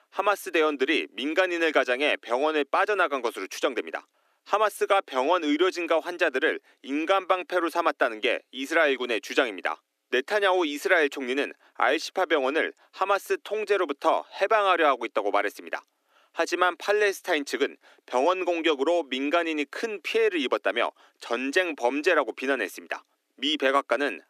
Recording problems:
thin; somewhat; fading below 300 Hz

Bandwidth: 14.5 kHz